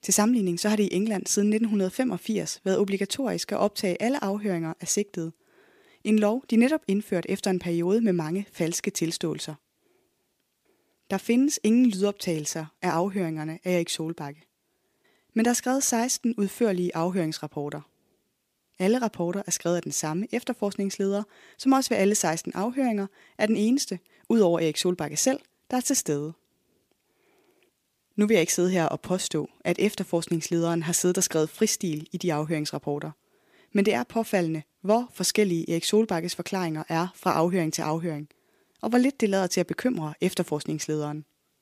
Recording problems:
none

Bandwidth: 15 kHz